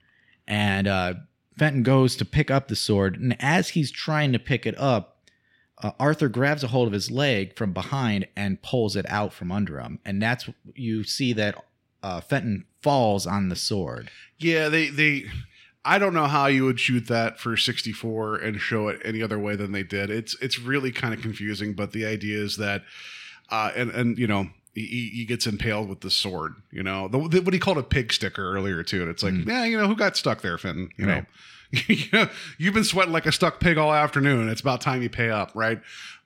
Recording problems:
none

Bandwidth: 16 kHz